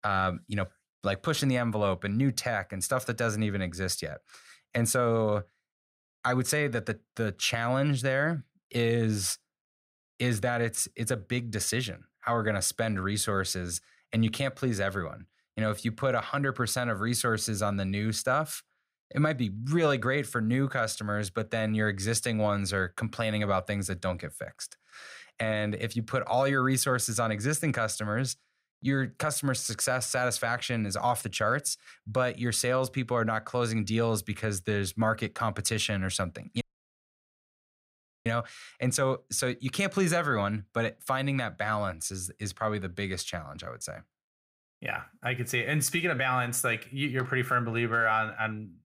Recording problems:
audio cutting out; at 37 s for 1.5 s

